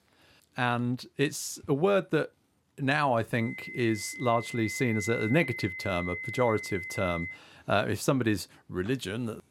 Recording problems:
high-pitched whine; loud; from 3.5 to 7.5 s; 2 kHz, 7 dB below the speech

